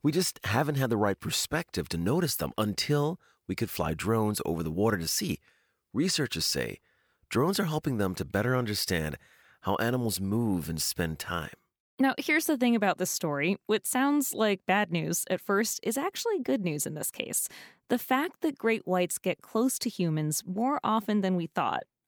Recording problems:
none

